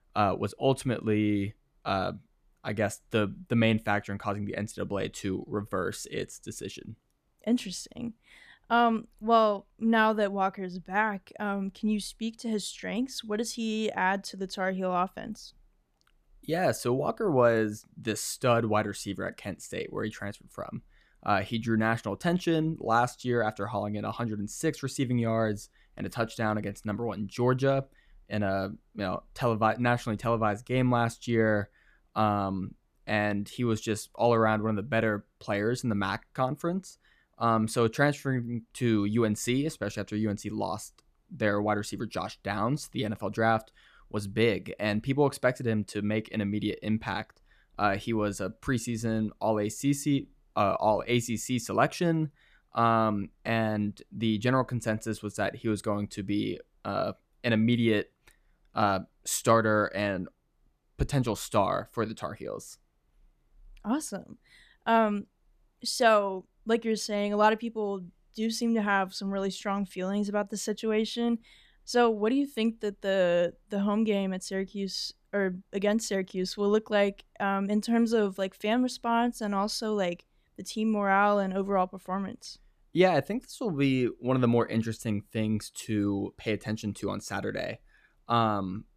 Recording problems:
none

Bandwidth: 14.5 kHz